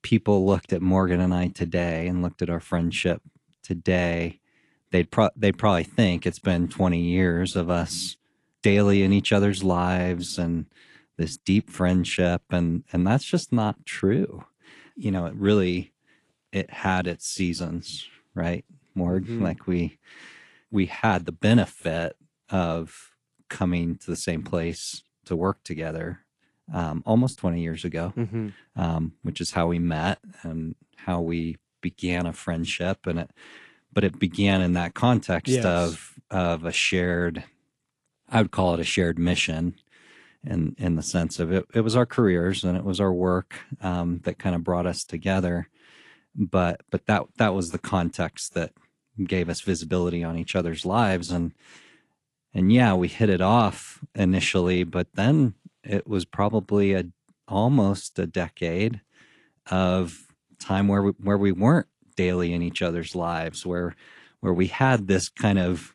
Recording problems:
garbled, watery; slightly; nothing above 11 kHz

